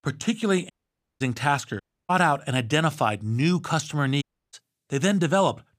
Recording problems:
audio cutting out; at 0.5 s for 0.5 s, at 2 s and at 4 s

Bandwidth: 15 kHz